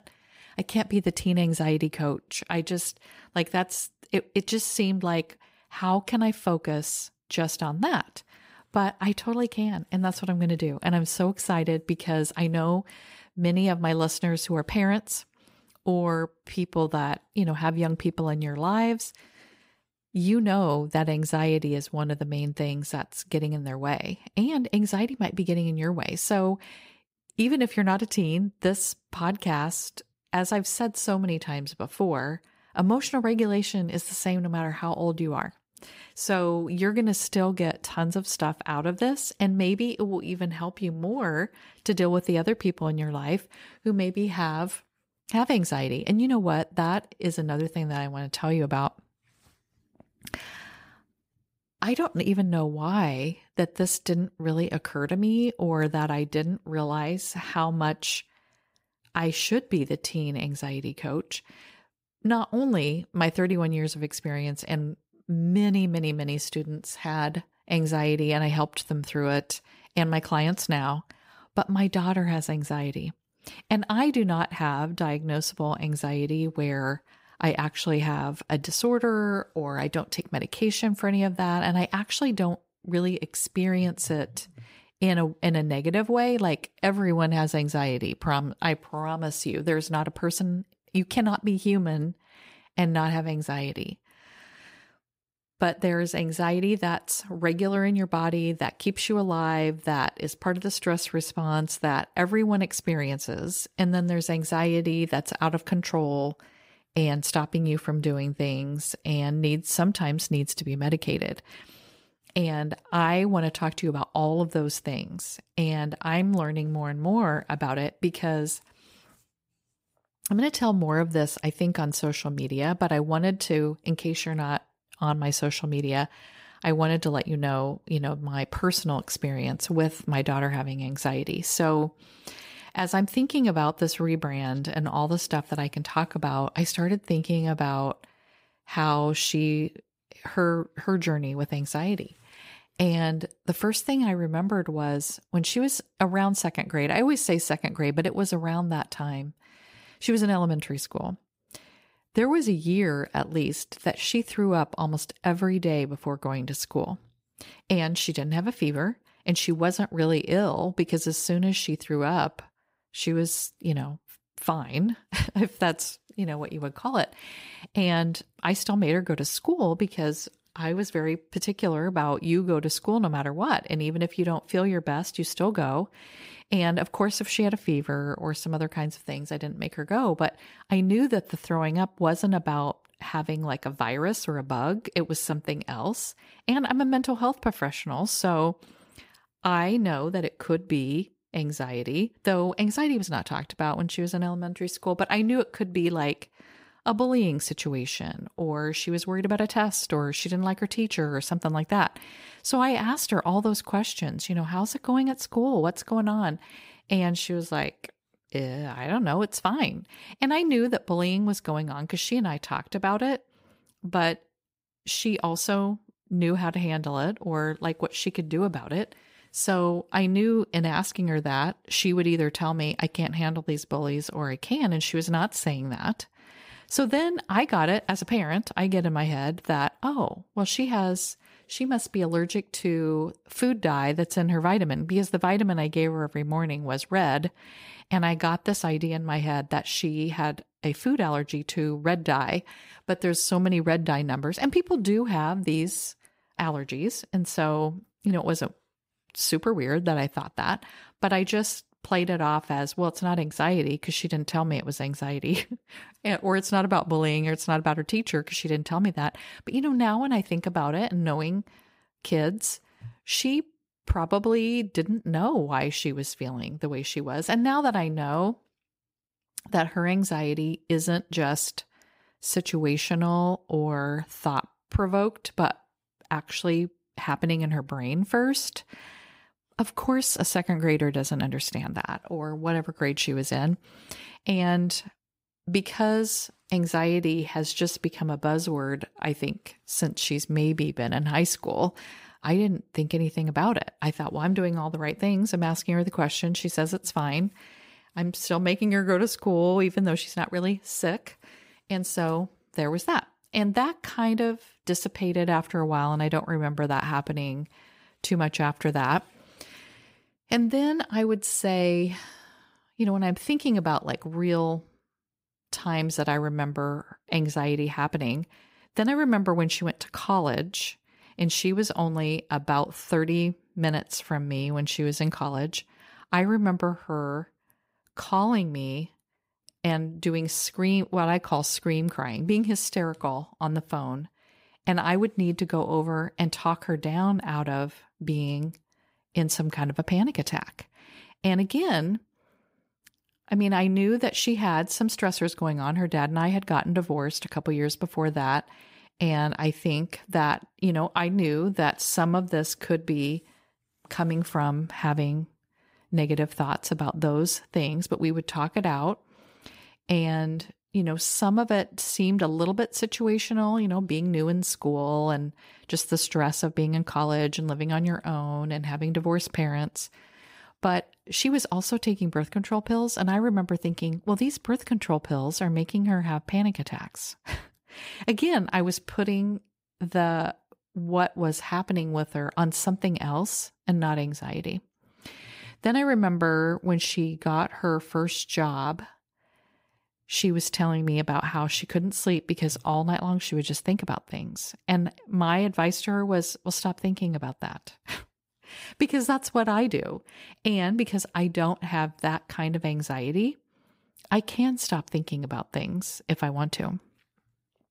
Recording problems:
none

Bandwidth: 15.5 kHz